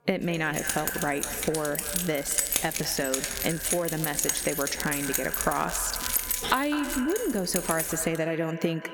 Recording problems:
echo of what is said; strong; throughout; 200 ms later, 10 dB below the speech
squashed, flat; somewhat, background pumping
crackling; loud; from 2 to 5 s and from 5 to 7 s; 10 dB below the speech
background music; faint; throughout; 25 dB below the speech
jangling keys; loud; from 0.5 to 8 s; peak 5 dB above the speech

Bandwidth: 17.5 kHz